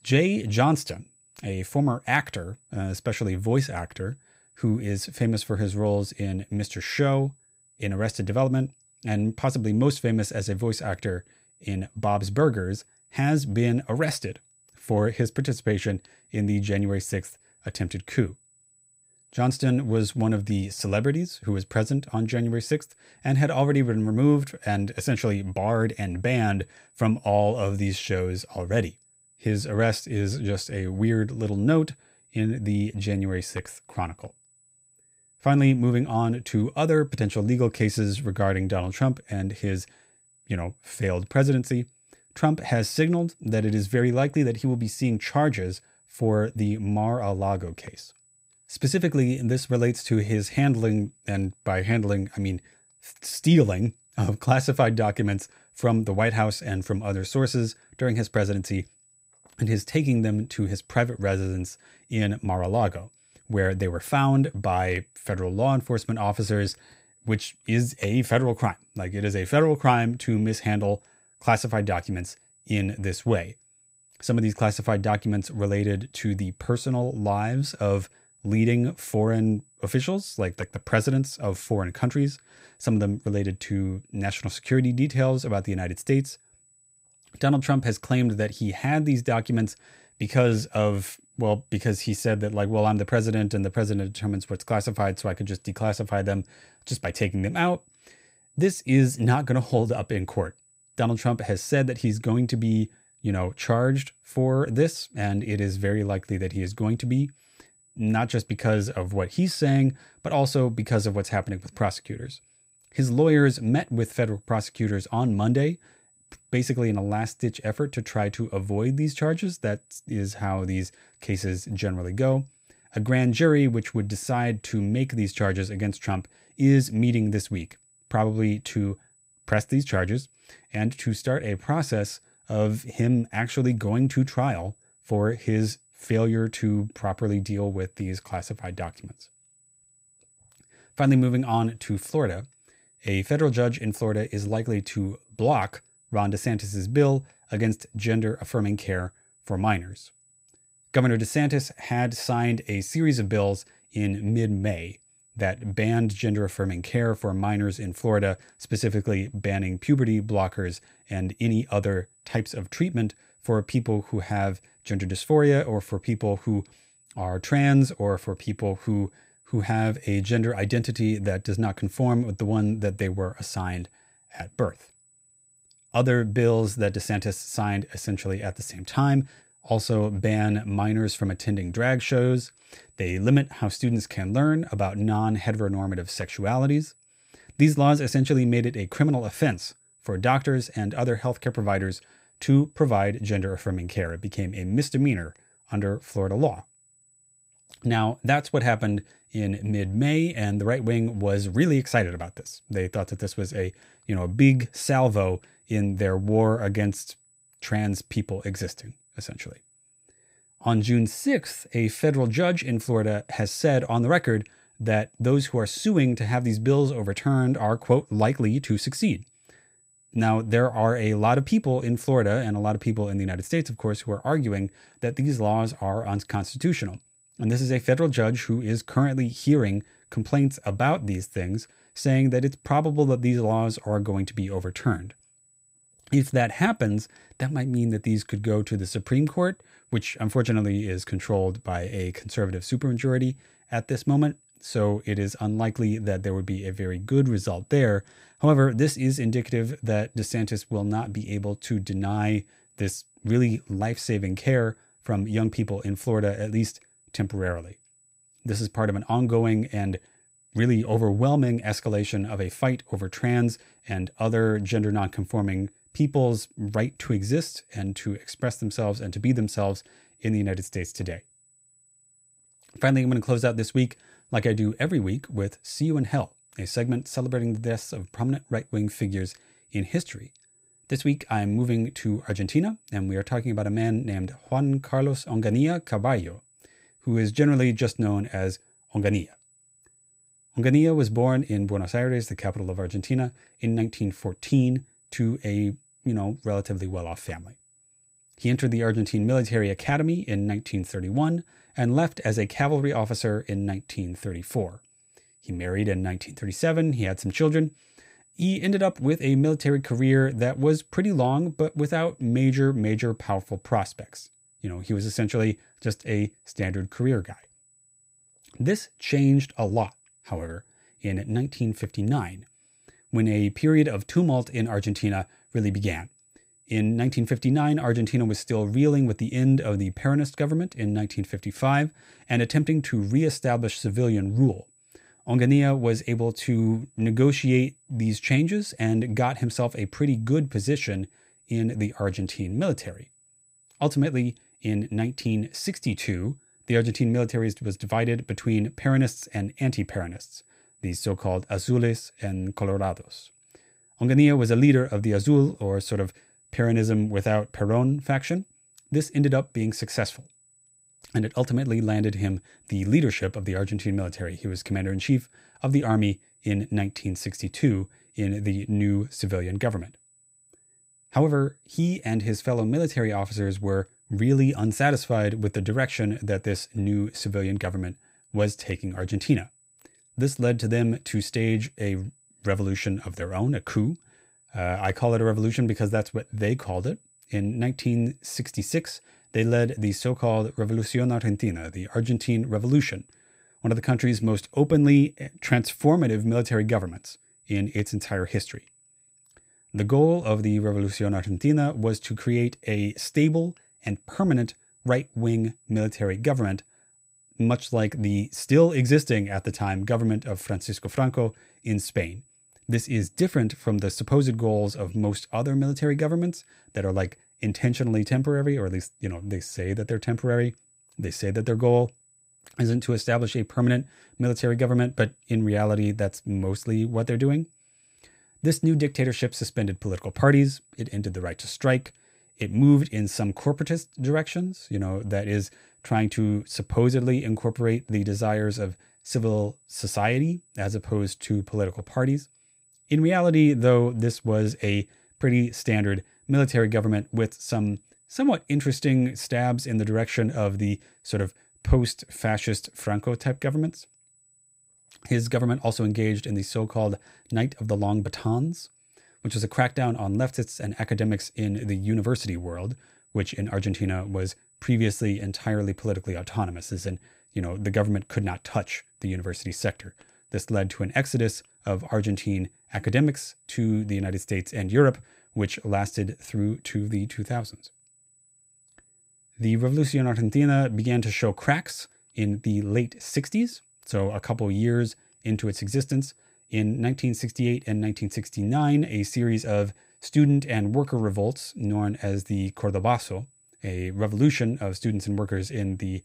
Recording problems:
high-pitched whine; faint; throughout; 8 kHz, 35 dB below the speech

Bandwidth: 15.5 kHz